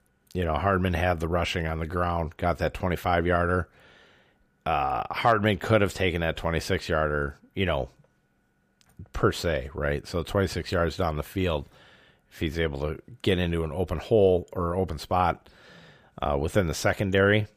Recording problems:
none

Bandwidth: 15 kHz